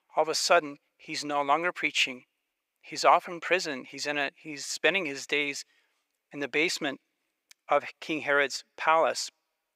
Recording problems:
thin; very; fading below 600 Hz

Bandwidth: 15.5 kHz